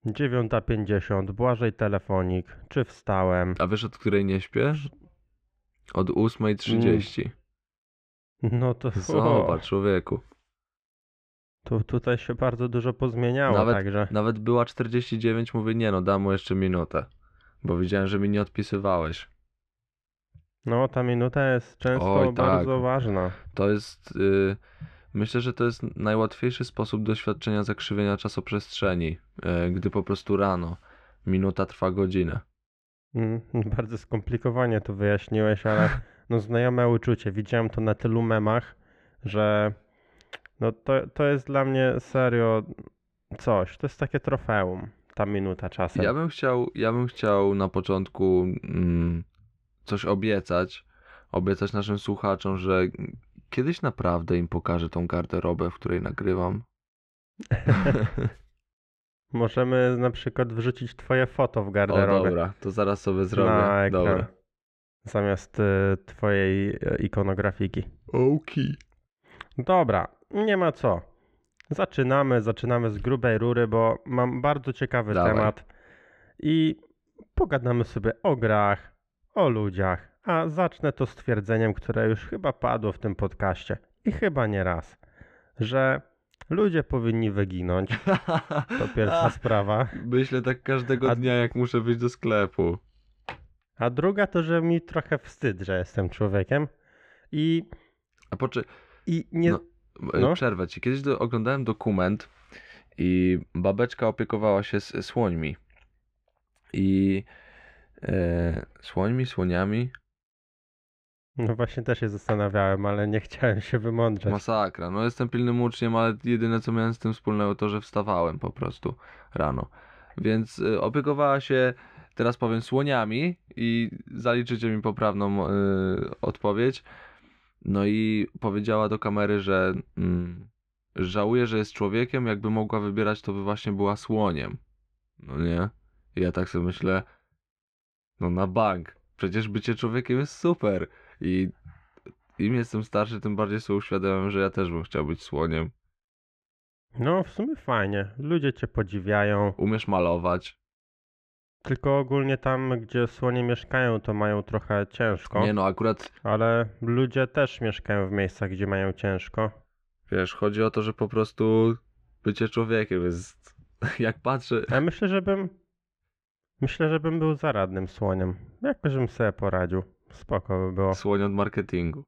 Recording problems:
muffled; very; fading above 2 kHz

